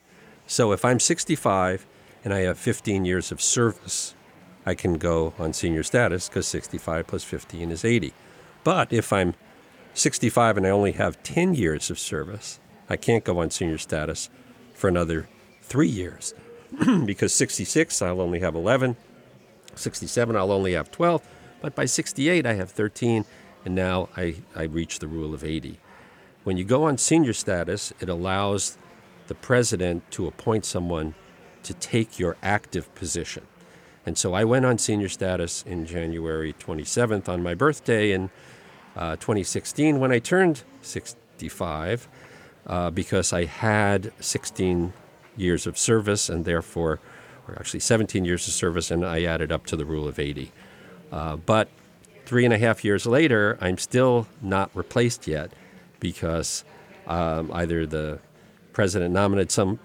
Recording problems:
murmuring crowd; faint; throughout; 25 dB below the speech

